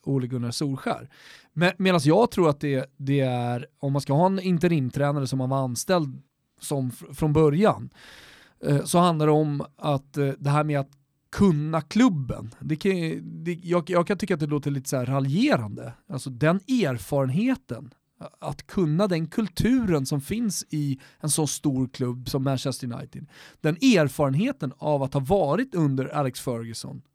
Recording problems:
none

